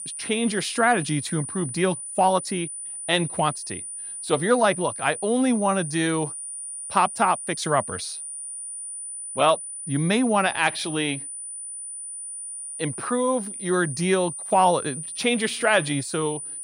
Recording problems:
high-pitched whine; loud; throughout; 9.5 kHz, 8 dB below the speech

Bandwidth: 16 kHz